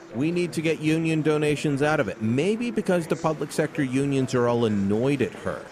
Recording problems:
murmuring crowd; noticeable; throughout; 15 dB below the speech

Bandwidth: 14.5 kHz